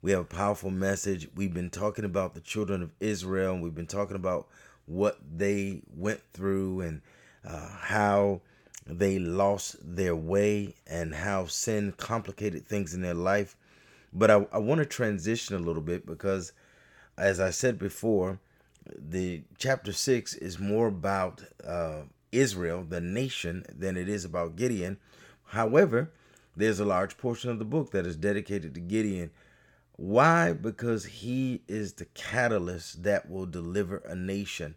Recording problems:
none

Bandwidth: 18 kHz